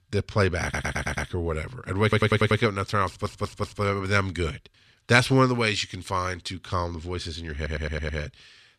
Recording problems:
audio stuttering; 4 times, first at 0.5 s

